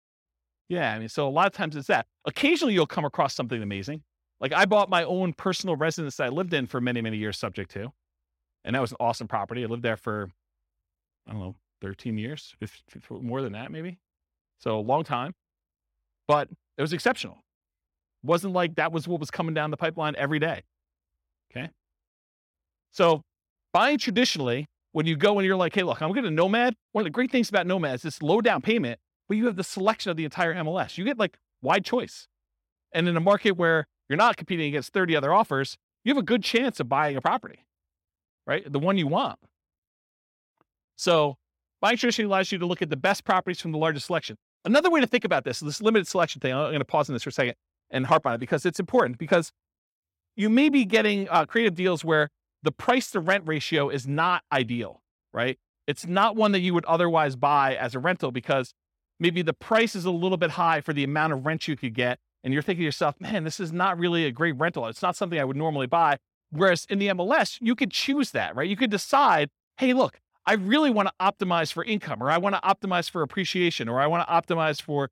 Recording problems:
none

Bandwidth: 16.5 kHz